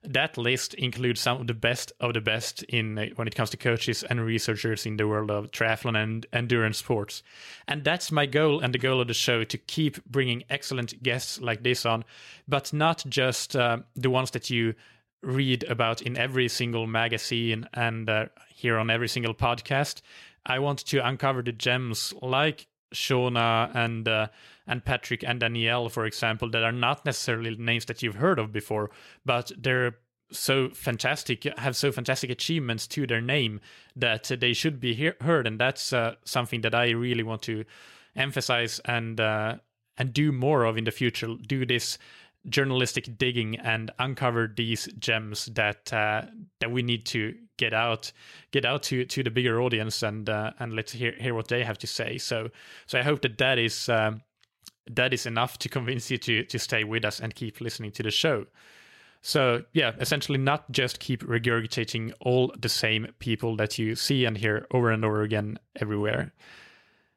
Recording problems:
none

